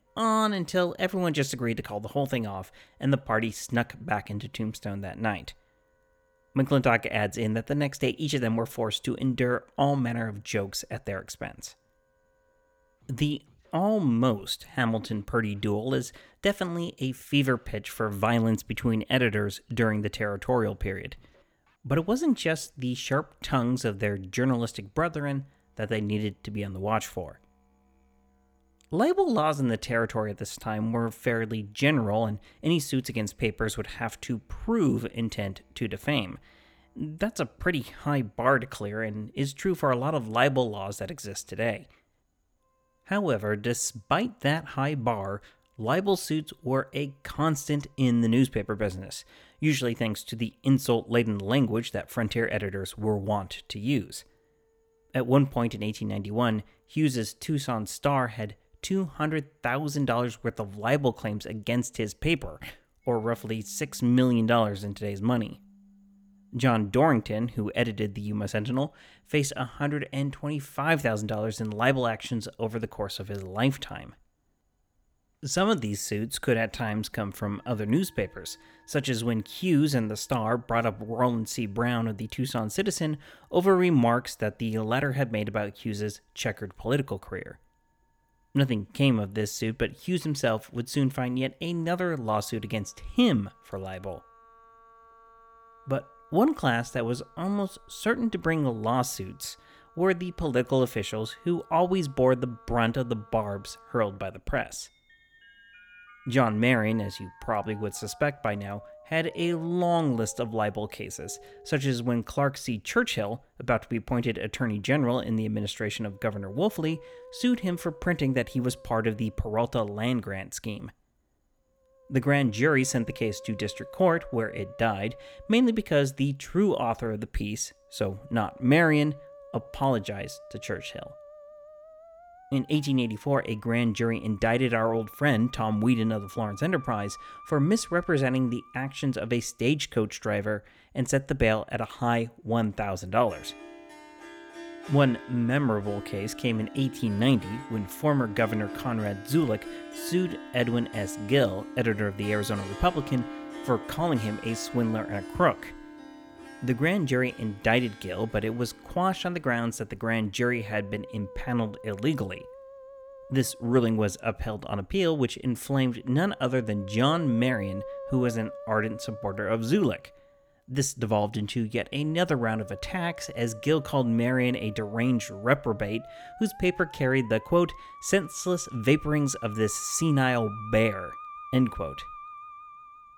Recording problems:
background music; noticeable; throughout; 15 dB below the speech

